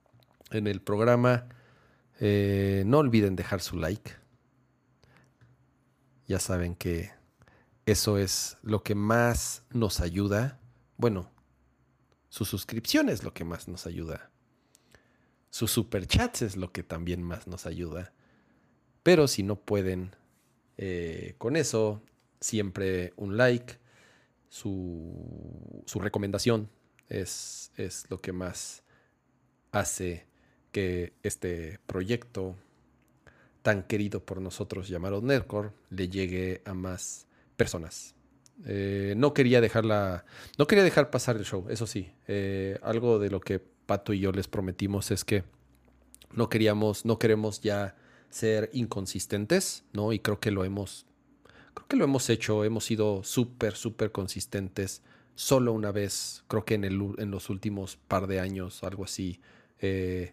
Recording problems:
uneven, jittery; strongly; from 26 to 38 s

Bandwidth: 15 kHz